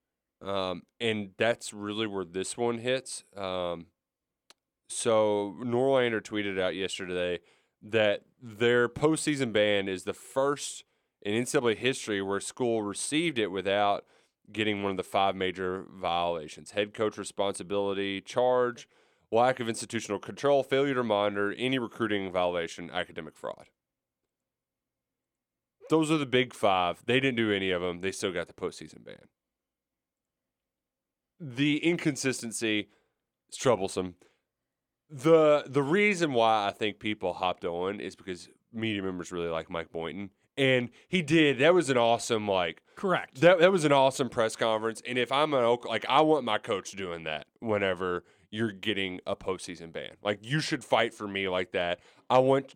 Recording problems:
none

